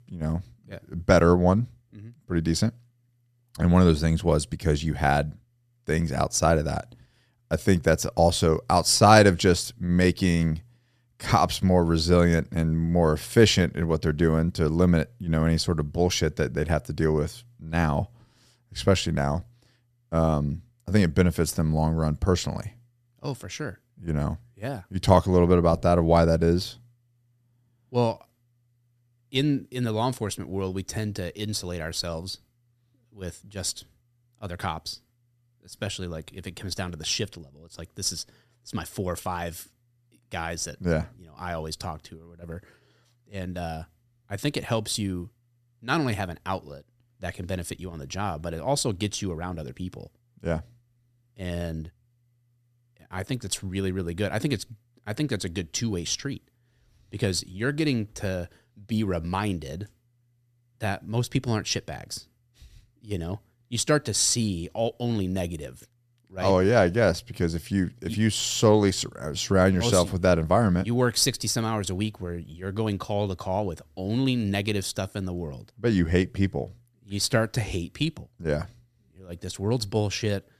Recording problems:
none

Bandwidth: 14 kHz